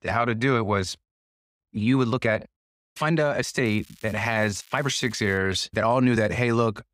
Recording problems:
crackling; faint; from 3.5 to 5.5 s; 25 dB below the speech
uneven, jittery; strongly; from 1 to 6.5 s

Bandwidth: 15.5 kHz